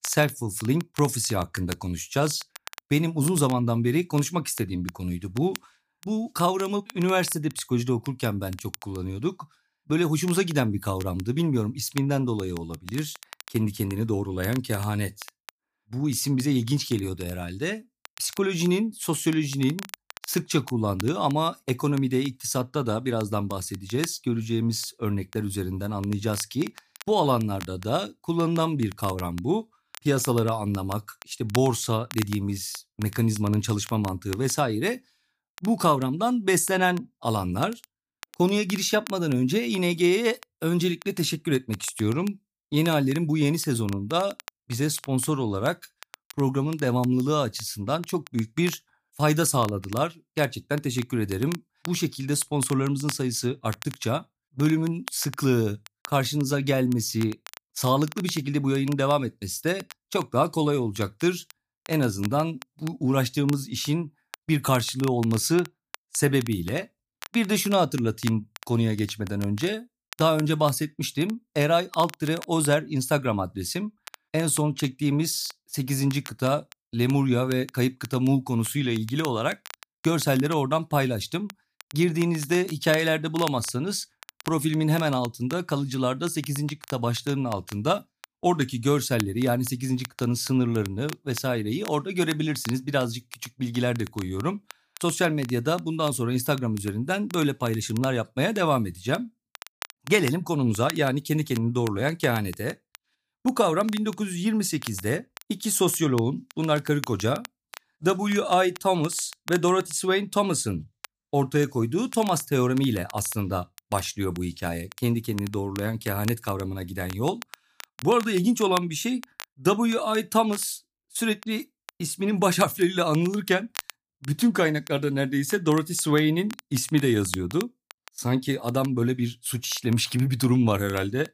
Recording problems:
crackle, like an old record; noticeable; 20 dB below the speech

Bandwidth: 15 kHz